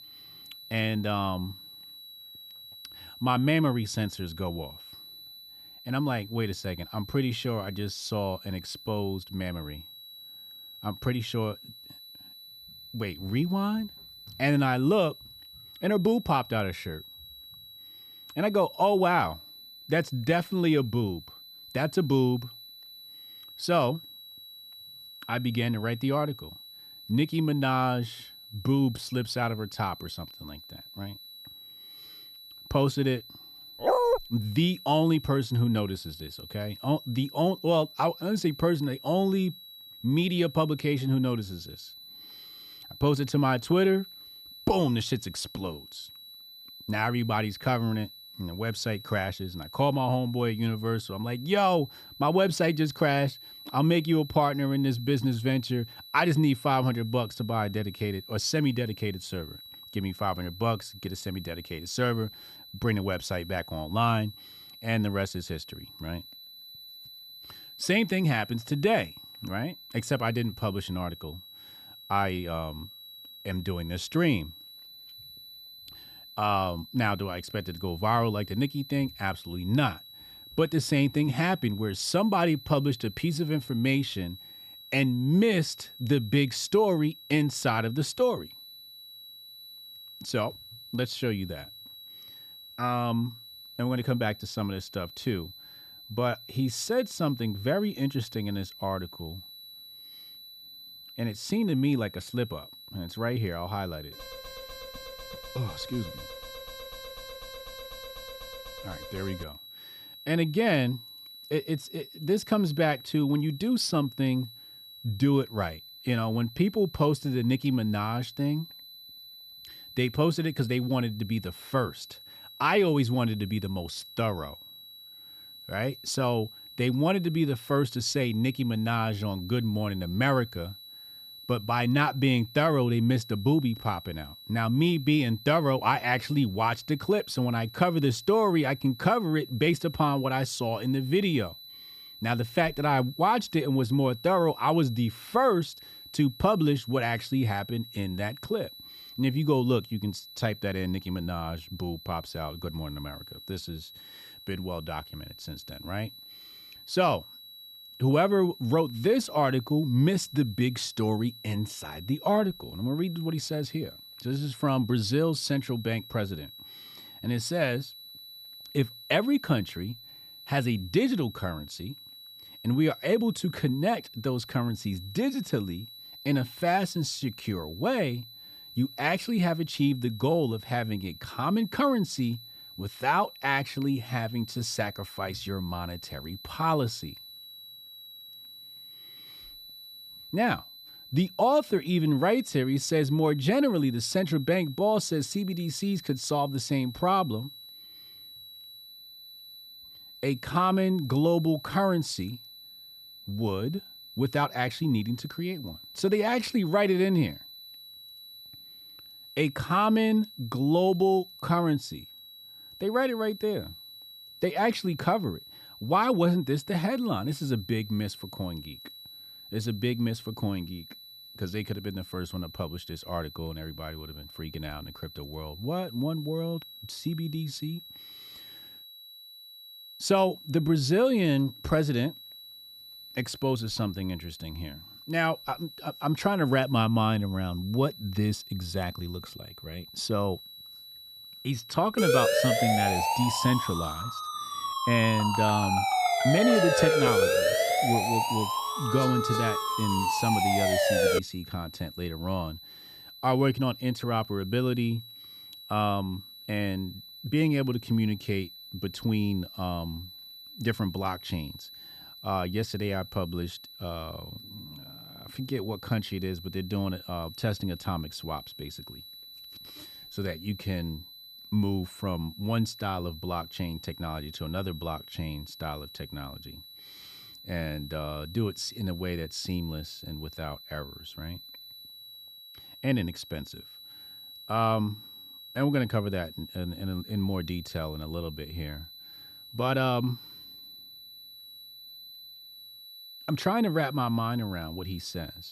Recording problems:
high-pitched whine; noticeable; throughout; 4 kHz, 15 dB below the speech
dog barking; loud; at 34 s; peak 5 dB above the speech
alarm; faint; from 1:44 to 1:49; peak 15 dB below the speech
siren; loud; from 4:02 to 4:11; peak 6 dB above the speech

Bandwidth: 14.5 kHz